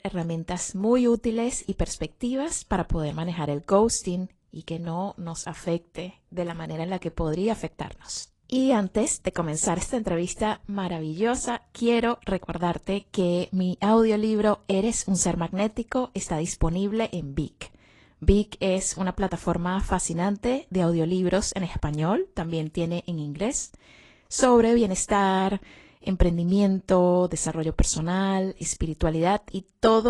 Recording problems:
garbled, watery; slightly
abrupt cut into speech; at the end

